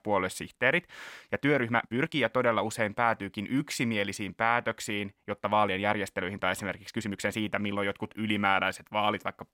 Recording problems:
uneven, jittery; strongly; from 1.5 to 7.5 s

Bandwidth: 16.5 kHz